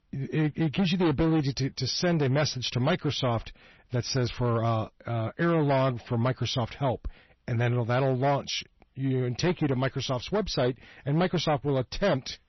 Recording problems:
distortion; slight; 10% of the sound clipped
garbled, watery; slightly; nothing above 6 kHz

